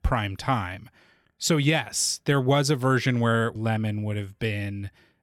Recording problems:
none

